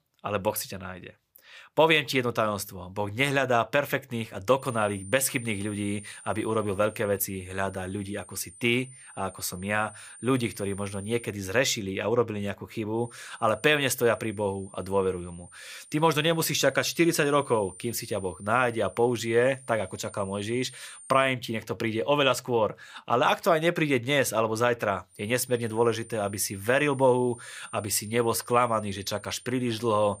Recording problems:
high-pitched whine; noticeable; from 4.5 to 11 s, from 13 to 21 s and from 25 s on; 9 kHz, 20 dB below the speech

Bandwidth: 15 kHz